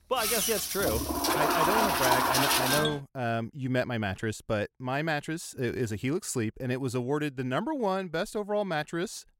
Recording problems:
household noises; very loud; until 3 s; 5 dB above the speech

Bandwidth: 16 kHz